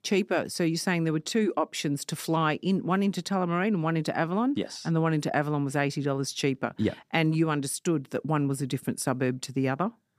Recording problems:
none

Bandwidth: 15 kHz